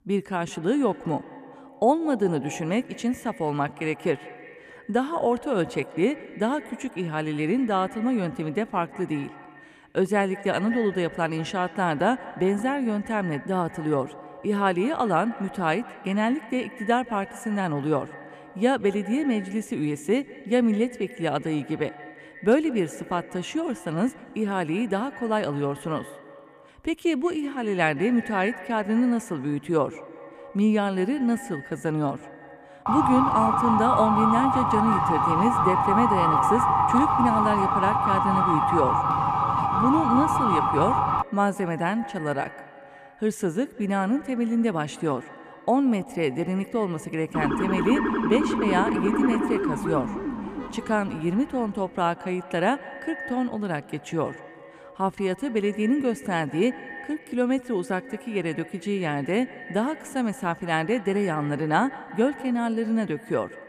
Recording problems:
echo of what is said; noticeable; throughout; 170 ms later, 15 dB below the speech
siren; loud; from 33 to 41 s and from 47 to 51 s; peak 5 dB above the speech

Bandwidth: 14.5 kHz